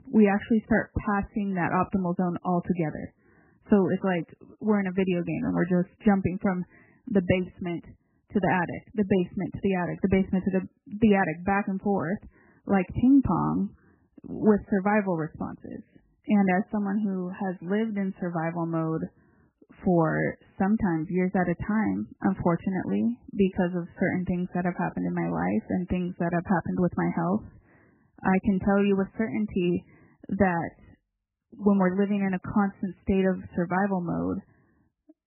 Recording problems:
garbled, watery; badly; nothing above 3 kHz
muffled; very slightly; fading above 3 kHz

